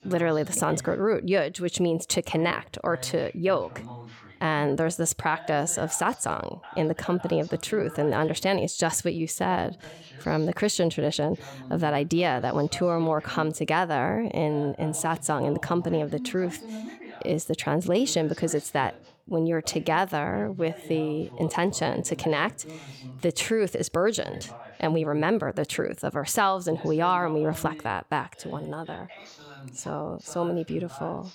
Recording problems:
voice in the background; noticeable; throughout; 15 dB below the speech

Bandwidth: 17.5 kHz